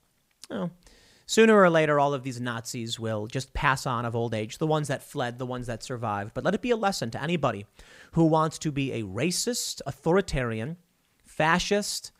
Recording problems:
none

